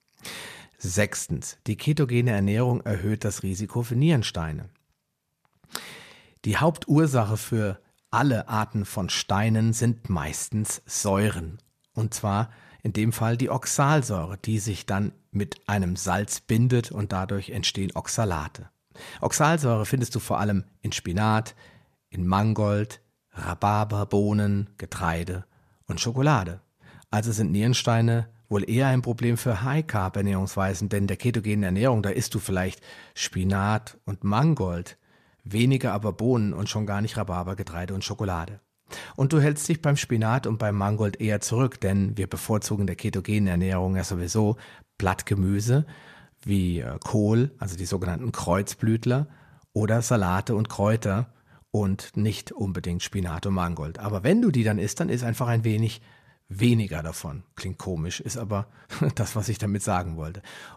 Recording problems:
none

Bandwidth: 14.5 kHz